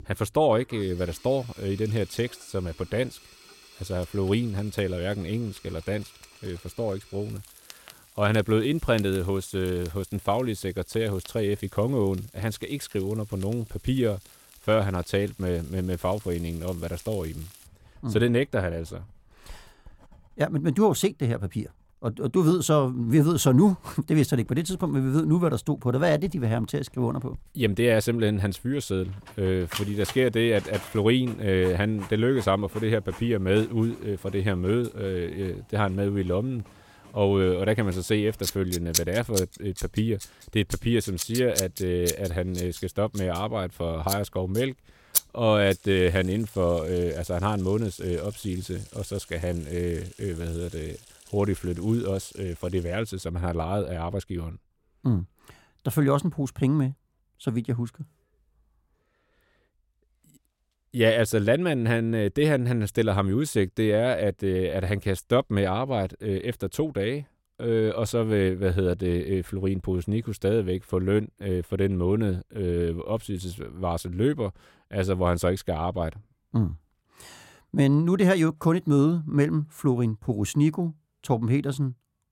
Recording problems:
household noises; noticeable; until 53 s; 10 dB below the speech

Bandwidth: 16.5 kHz